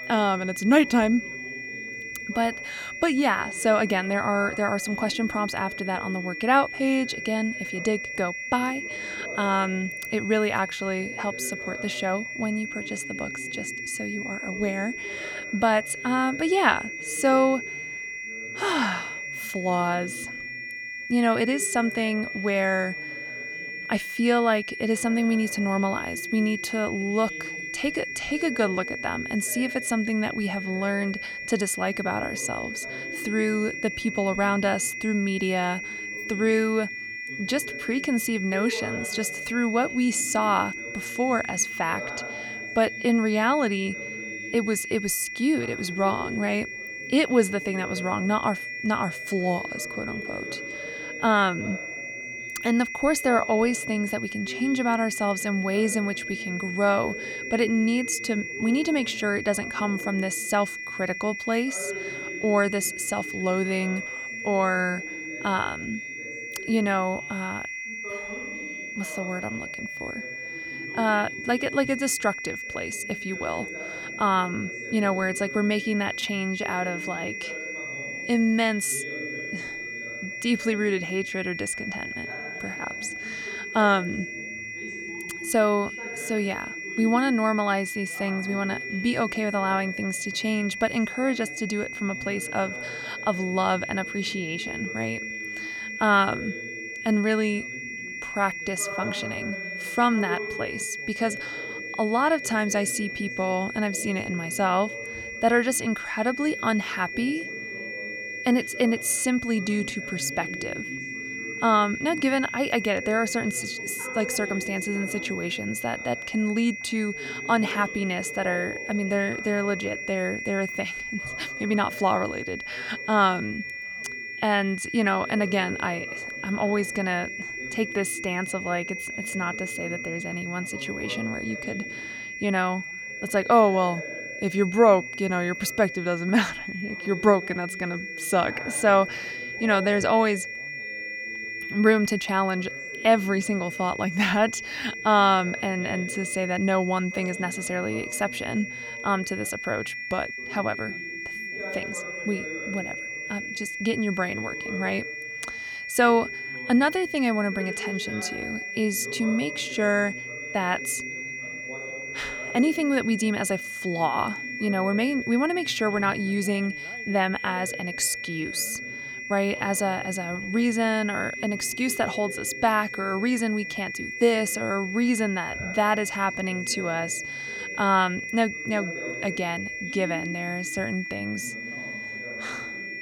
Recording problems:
high-pitched whine; loud; throughout; 2 kHz, 7 dB below the speech
background chatter; noticeable; throughout; 2 voices, 15 dB below the speech

